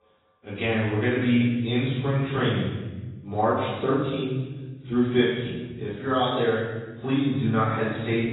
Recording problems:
room echo; strong; dies away in 1.2 s
off-mic speech; far
garbled, watery; badly; nothing above 4 kHz
echo of what is said; faint; throughout; 280 ms later, 25 dB below the speech

